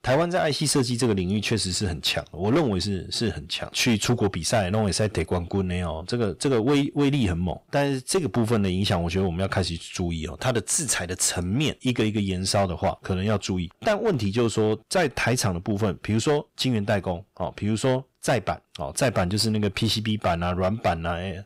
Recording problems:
distortion; slight; 8% of the sound clipped

